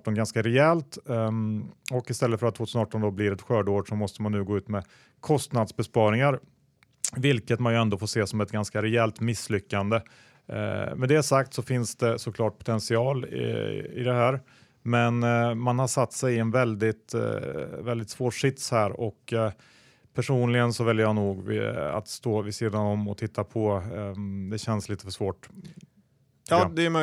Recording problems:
abrupt cut into speech; at the end

